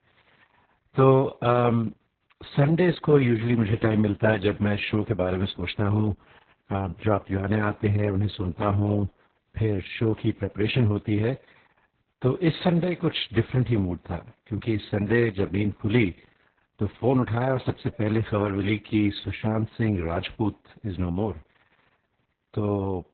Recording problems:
garbled, watery; badly; nothing above 4 kHz

